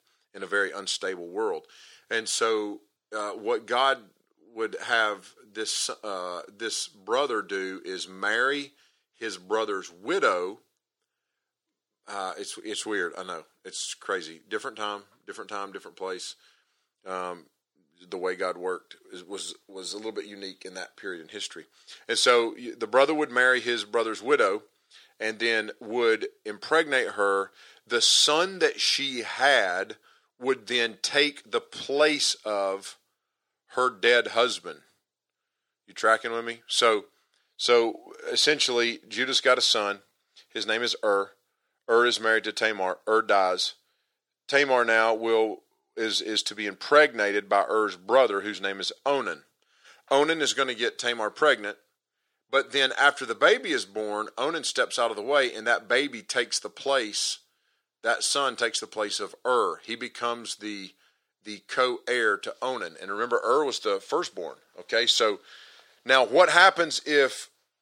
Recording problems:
thin; very; fading below 400 Hz

